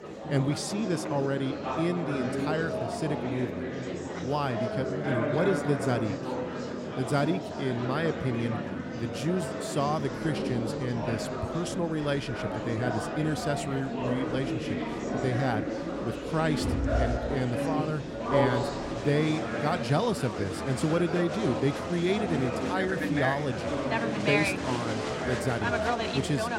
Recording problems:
murmuring crowd; loud; throughout; 1 dB below the speech

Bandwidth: 16 kHz